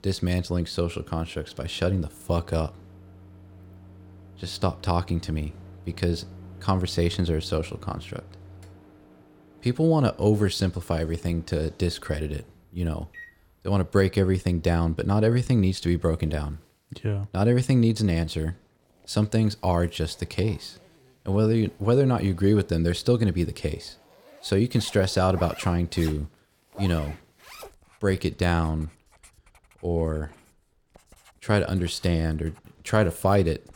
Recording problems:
household noises; faint; throughout; 25 dB below the speech

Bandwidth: 17 kHz